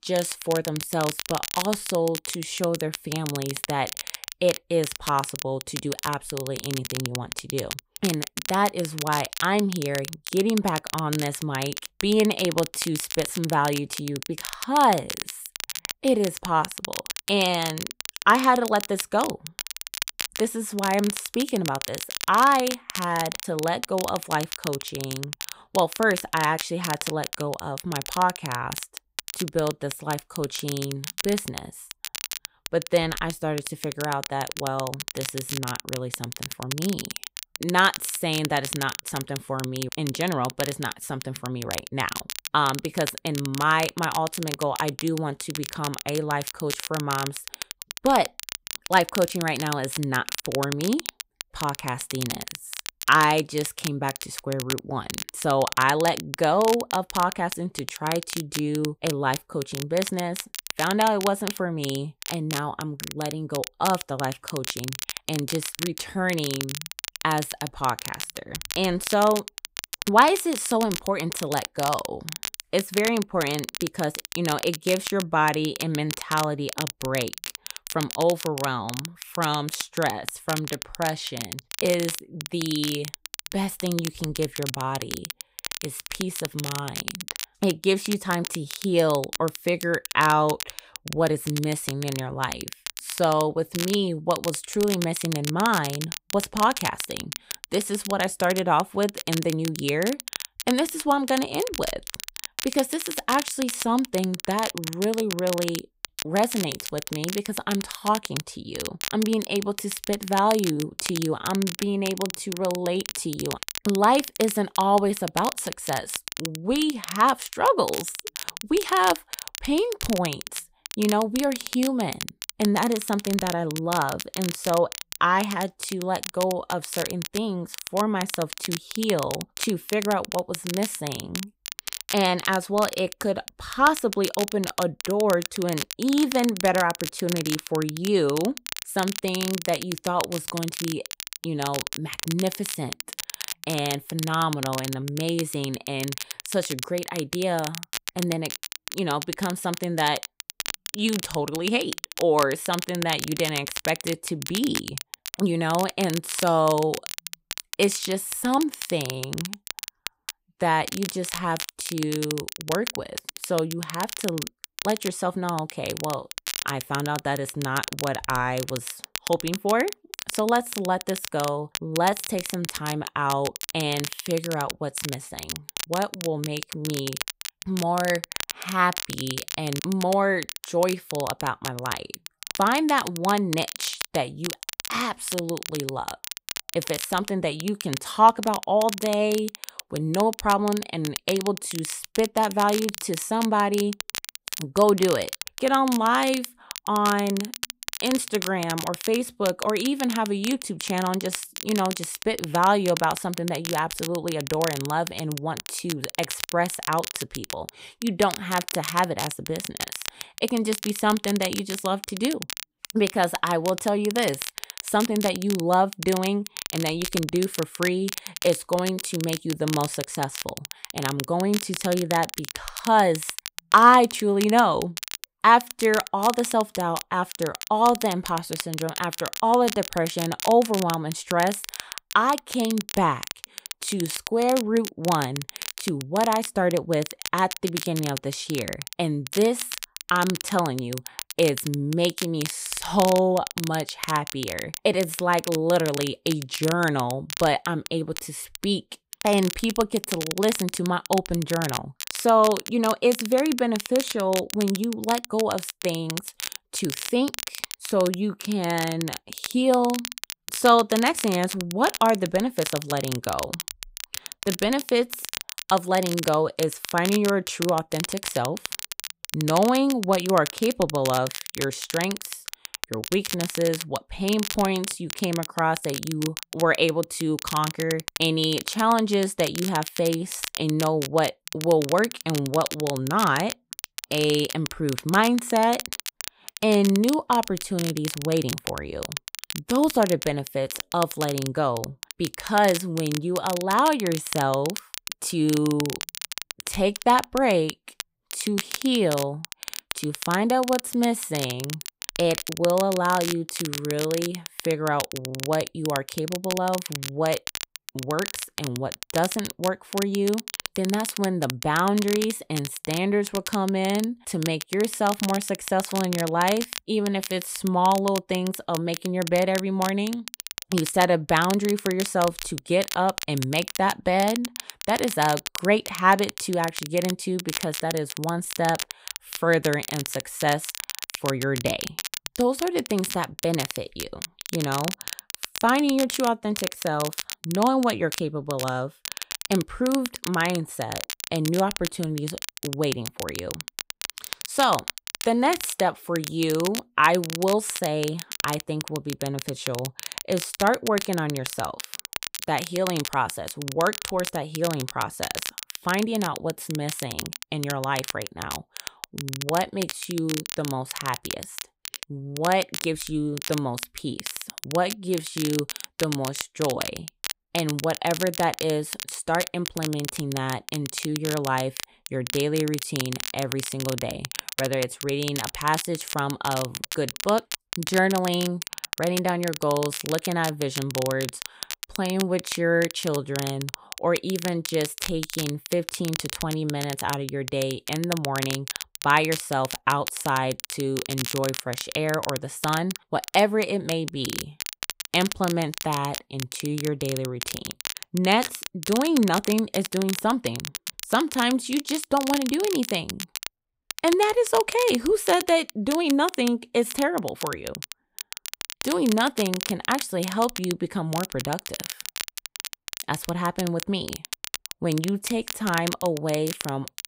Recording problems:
crackle, like an old record; loud; 8 dB below the speech

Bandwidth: 15.5 kHz